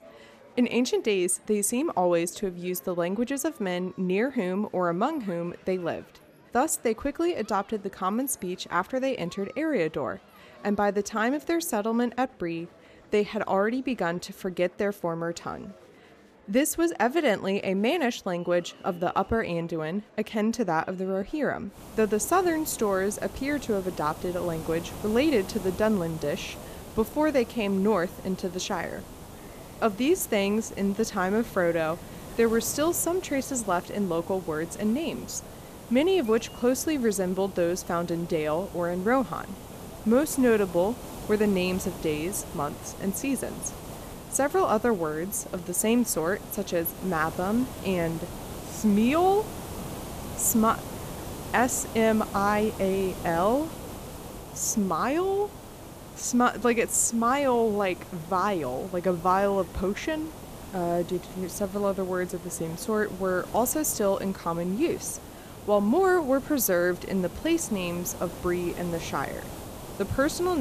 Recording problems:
hiss; noticeable; from 22 s on; 15 dB below the speech
murmuring crowd; faint; throughout; 25 dB below the speech
abrupt cut into speech; at the end

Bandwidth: 14.5 kHz